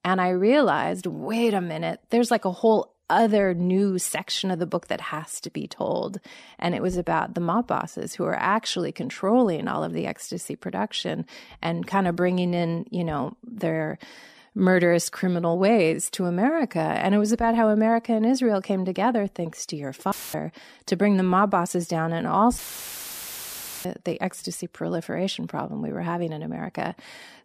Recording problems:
audio cutting out; filled with static; at 20 s and at 23 s for 1.5 s

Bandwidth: 14.5 kHz